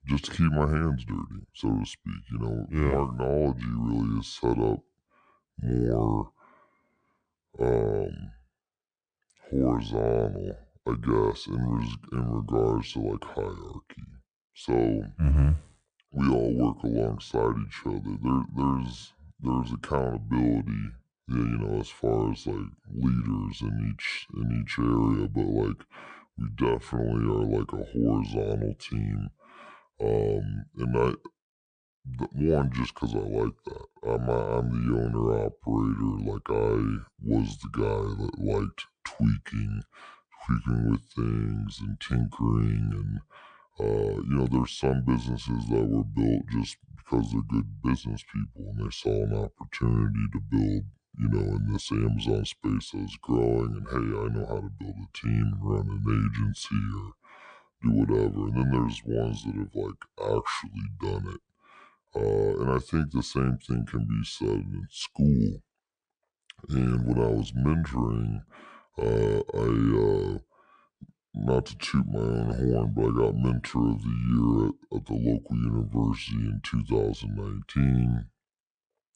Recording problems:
wrong speed and pitch; too slow and too low; 0.7 times normal speed

